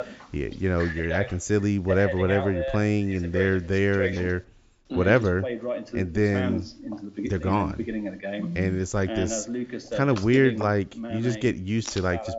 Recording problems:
high frequencies cut off; noticeable; nothing above 8 kHz
voice in the background; loud; throughout; 8 dB below the speech

